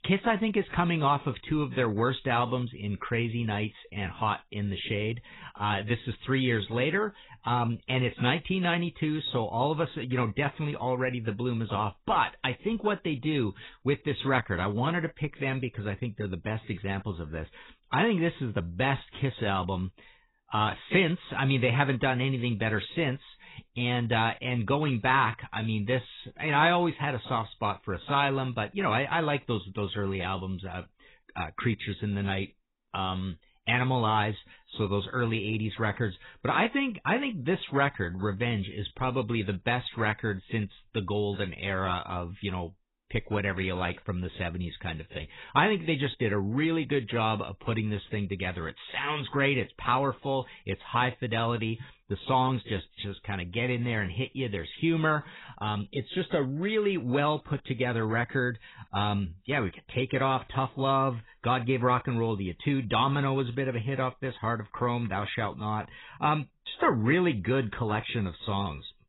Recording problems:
garbled, watery; badly; nothing above 4 kHz

